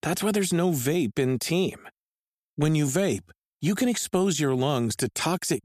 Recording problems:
none

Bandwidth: 14.5 kHz